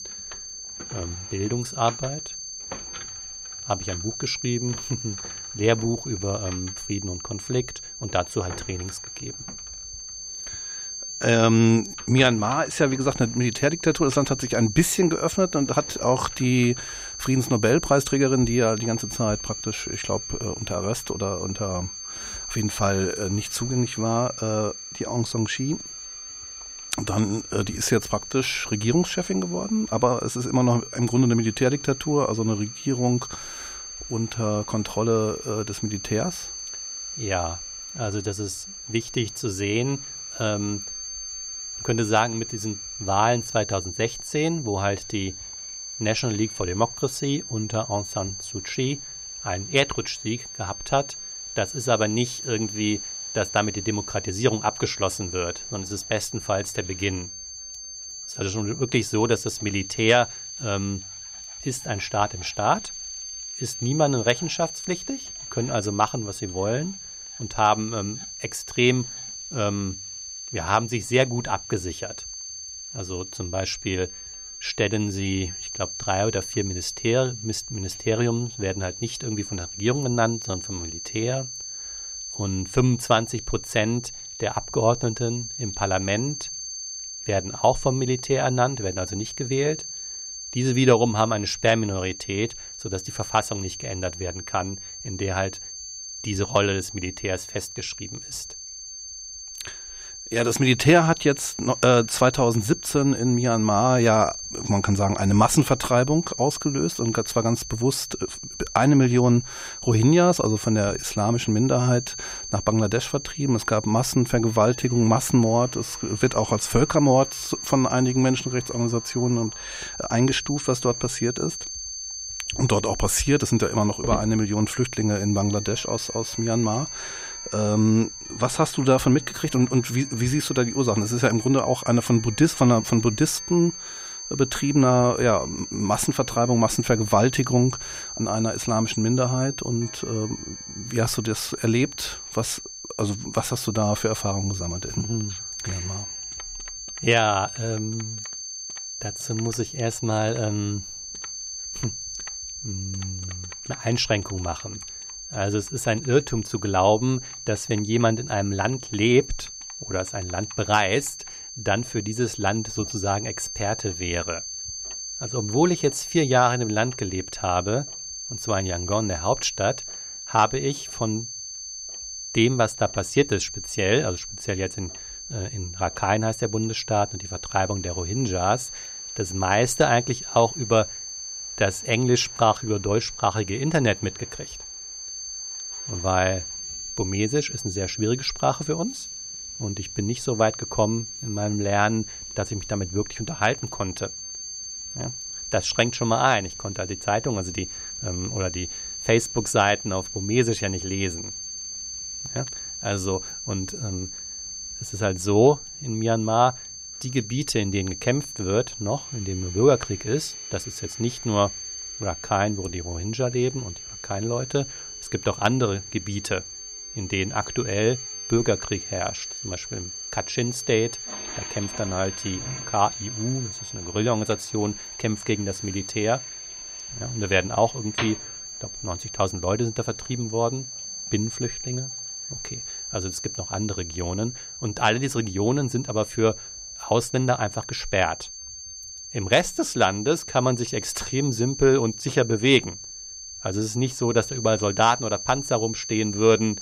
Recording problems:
high-pitched whine; loud; throughout; 6.5 kHz, 9 dB below the speech
household noises; faint; throughout; 25 dB below the speech

